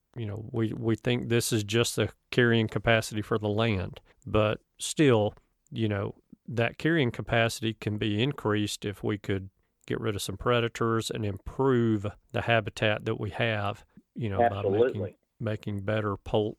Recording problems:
none

